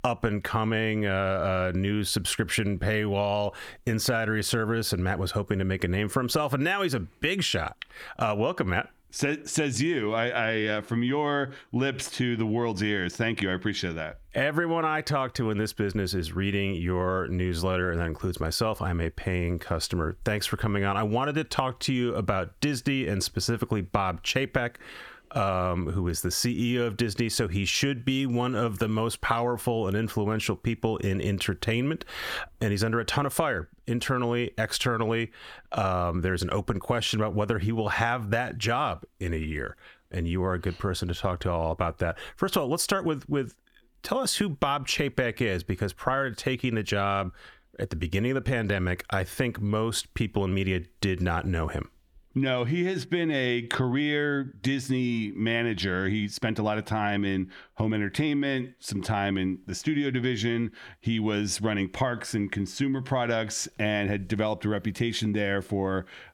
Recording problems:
squashed, flat; heavily

